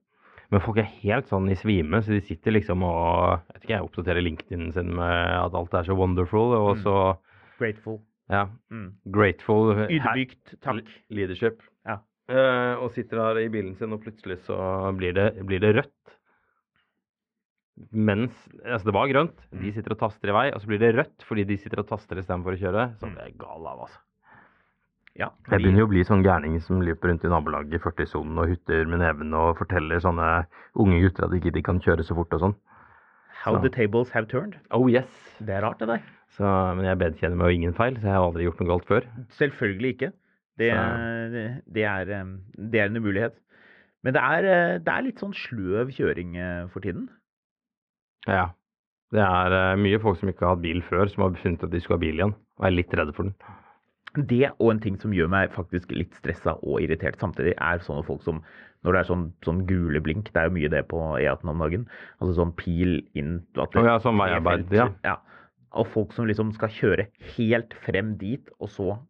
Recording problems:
muffled; very; fading above 2 kHz

